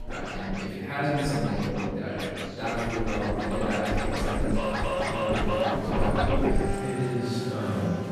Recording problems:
room echo; strong; dies away in 2.1 s
off-mic speech; far
background music; very loud; throughout; as loud as the speech
chatter from many people; noticeable; throughout; 10 dB below the speech

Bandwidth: 14.5 kHz